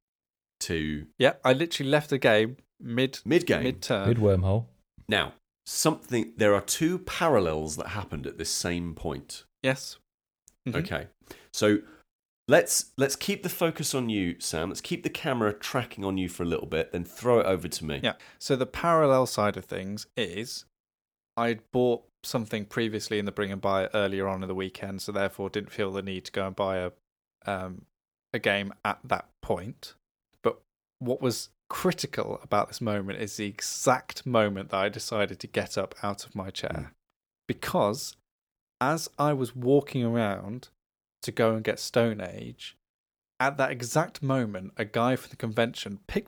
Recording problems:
none

